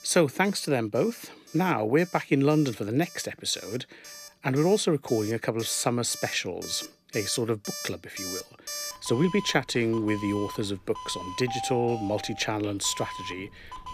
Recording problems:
alarms or sirens; noticeable; throughout; 10 dB below the speech

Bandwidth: 14.5 kHz